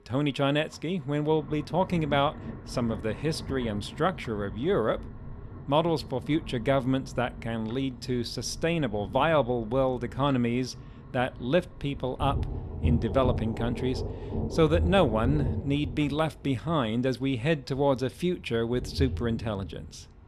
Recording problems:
rain or running water; loud; throughout; 9 dB below the speech

